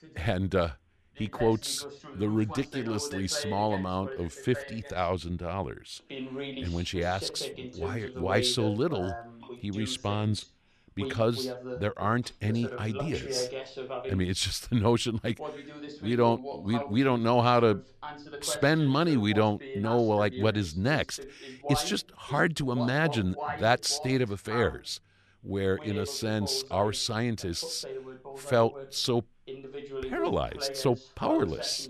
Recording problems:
voice in the background; noticeable; throughout; 10 dB below the speech

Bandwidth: 14 kHz